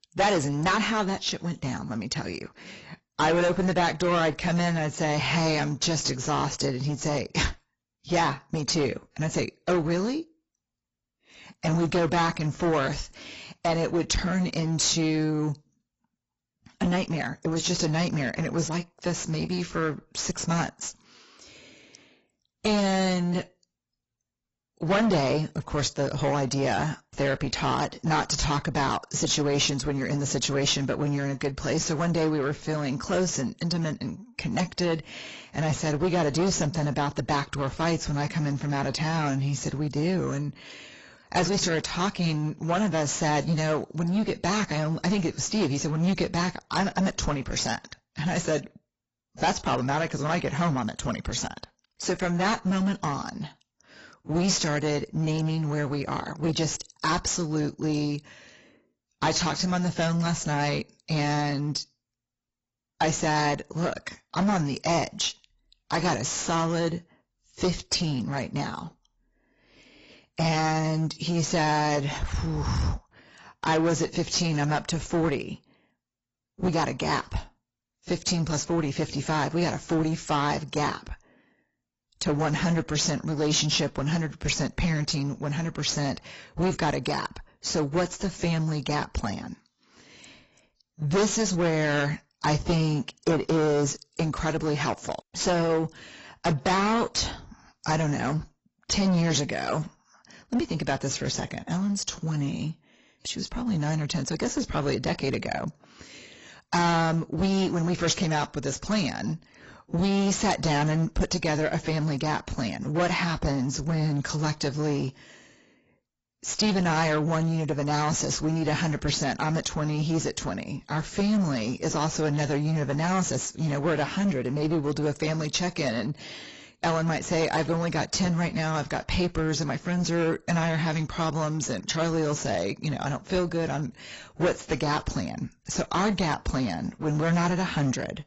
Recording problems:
distortion; heavy; 11% of the sound clipped
garbled, watery; badly; nothing above 7.5 kHz

